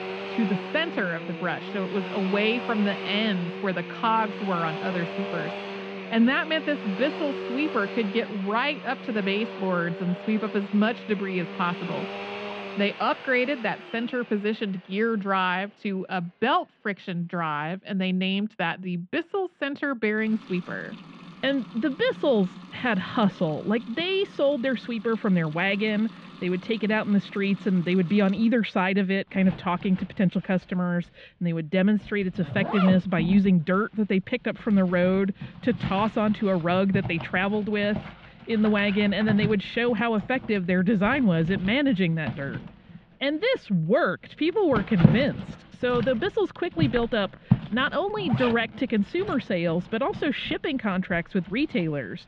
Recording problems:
muffled; slightly; fading above 3 kHz
household noises; loud; throughout; 9 dB below the speech

